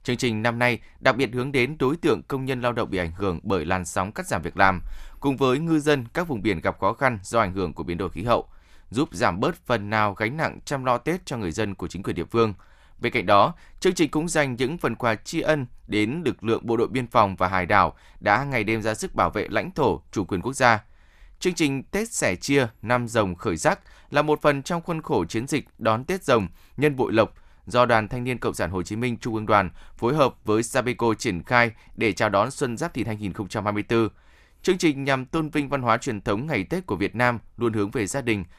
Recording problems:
none

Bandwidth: 14.5 kHz